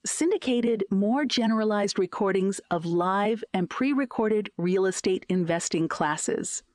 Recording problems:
squashed, flat; heavily

